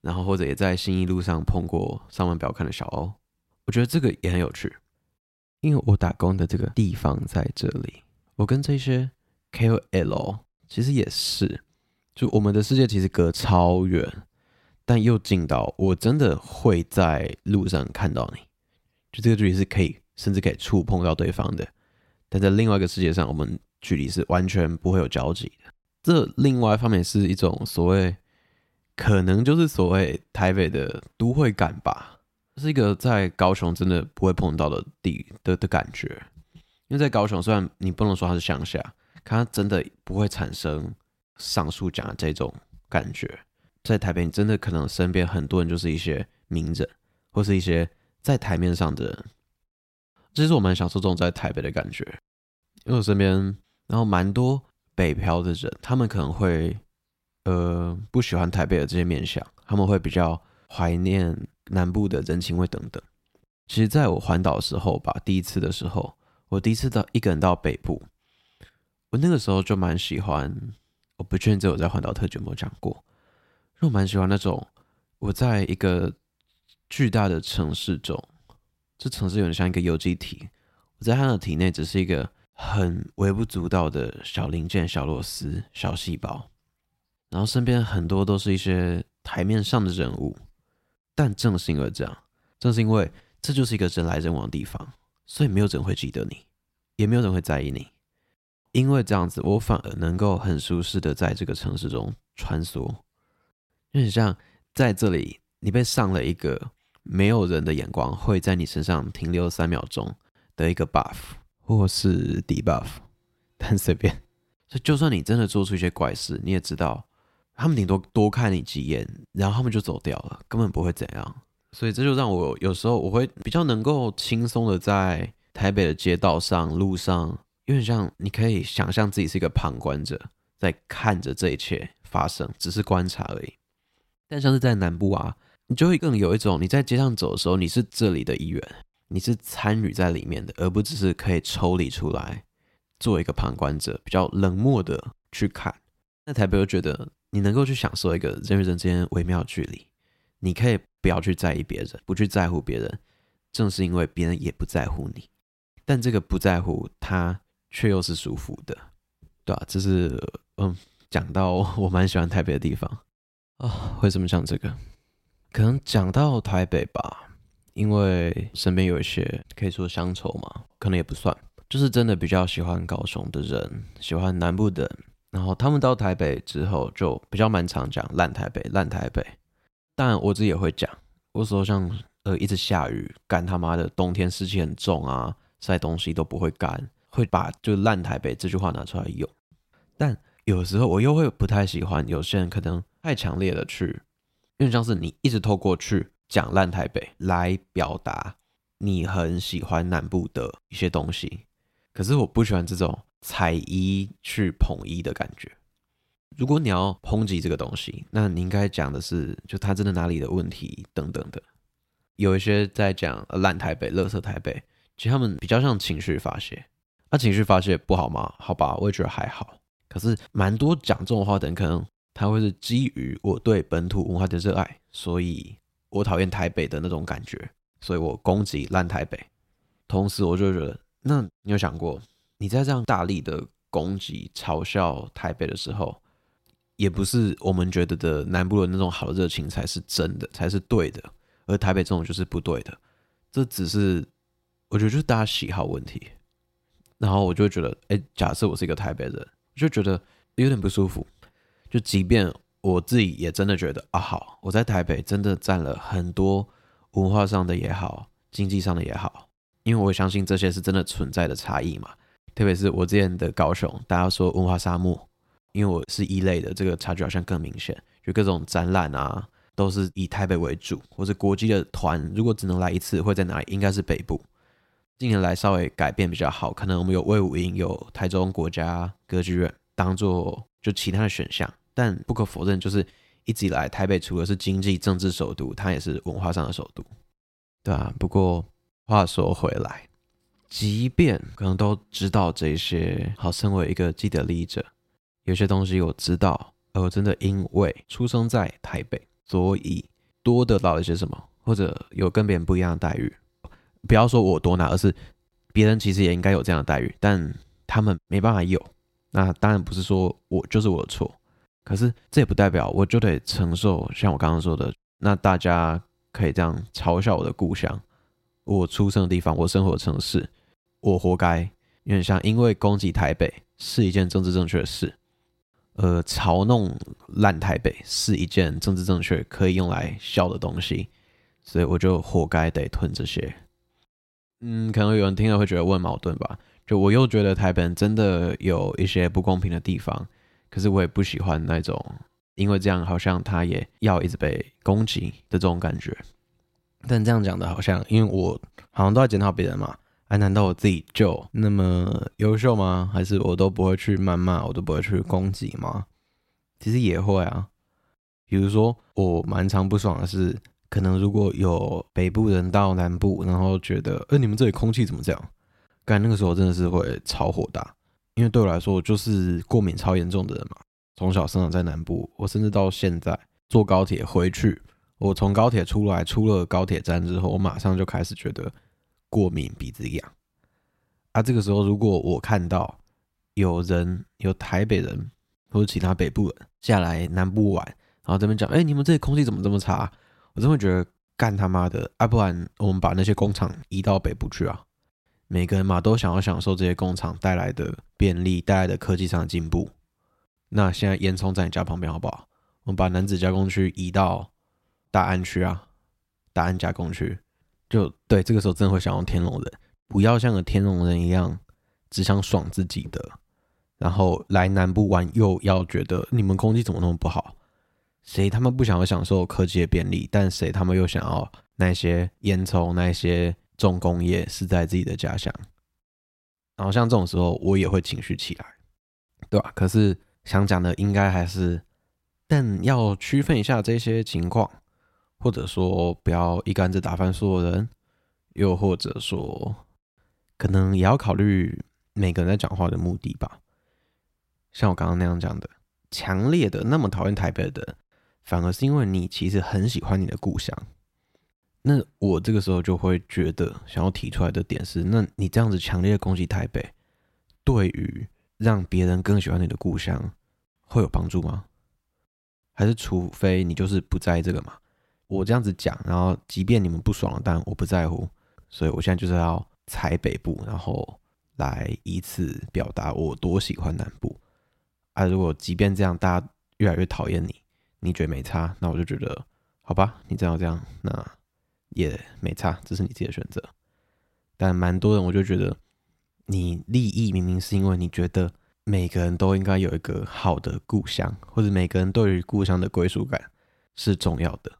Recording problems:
none

